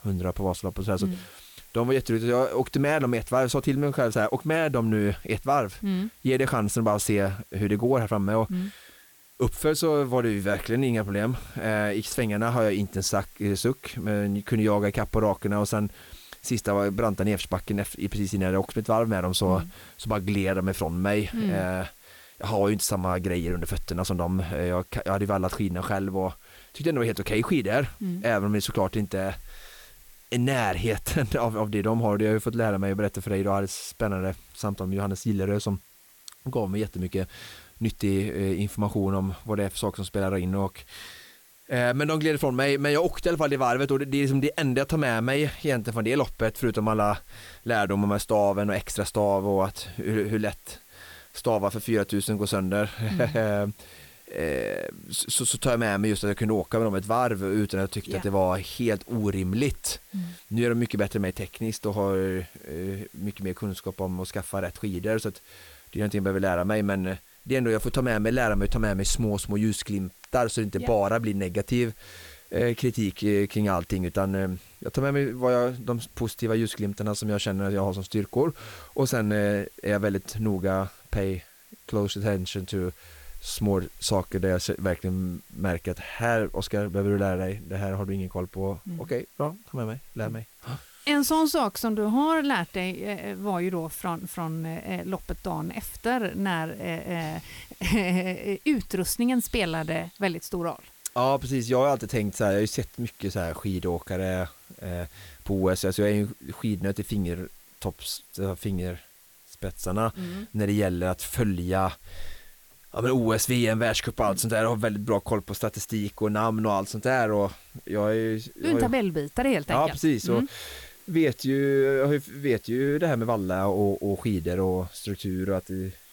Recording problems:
hiss; faint; throughout; 25 dB below the speech

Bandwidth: 18 kHz